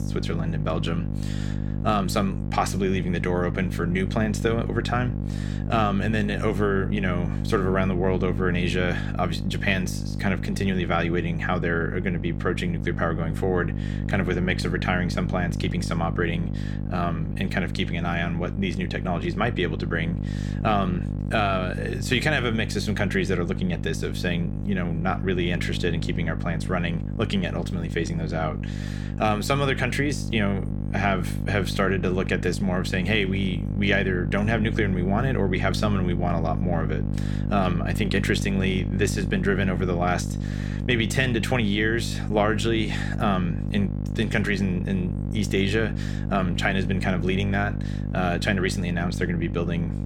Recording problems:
electrical hum; noticeable; throughout; 50 Hz, 10 dB below the speech

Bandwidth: 17 kHz